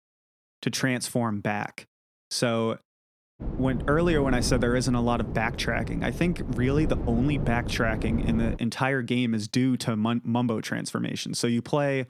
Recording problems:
wind noise on the microphone; occasional gusts; from 3.5 to 8.5 s; 10 dB below the speech

